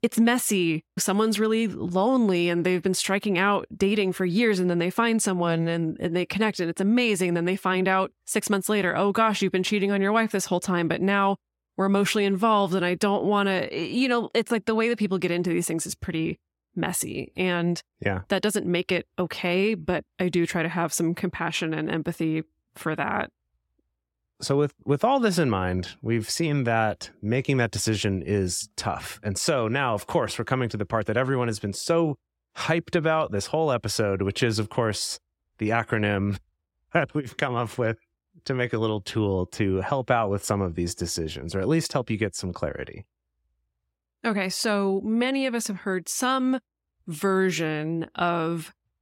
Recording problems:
none

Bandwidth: 16.5 kHz